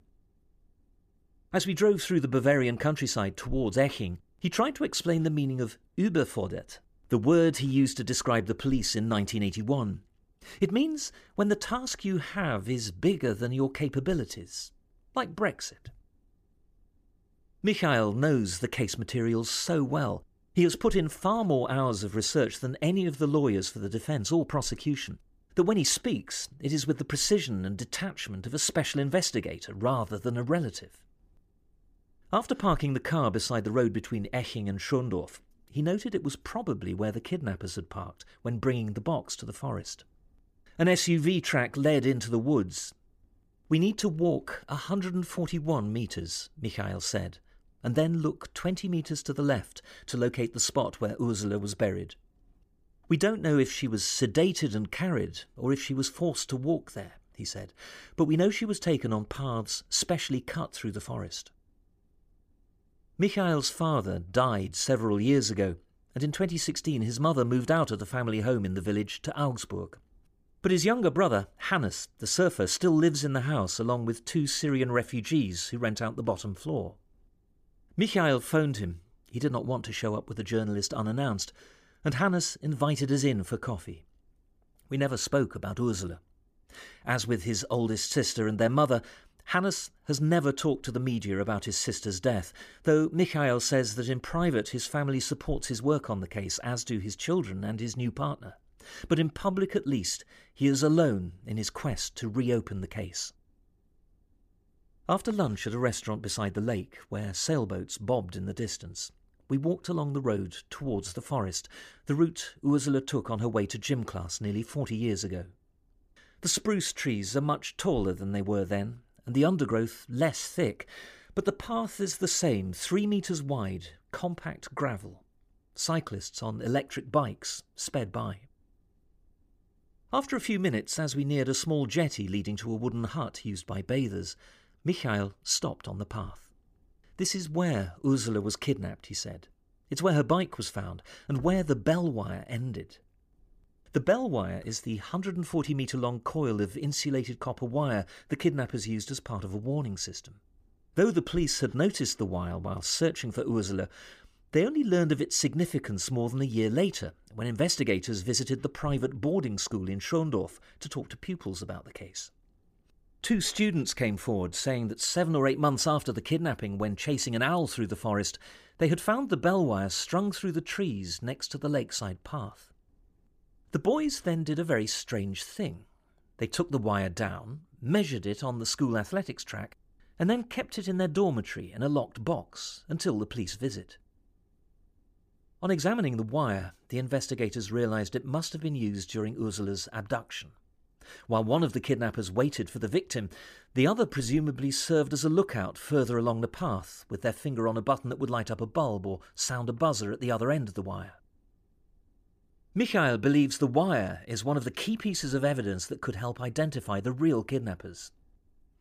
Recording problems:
none

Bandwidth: 15 kHz